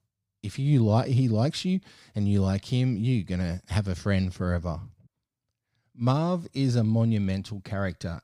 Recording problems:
none

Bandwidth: 15 kHz